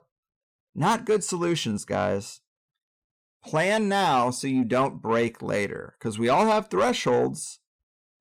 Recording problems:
distortion; slight; 10 dB below the speech

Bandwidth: 17.5 kHz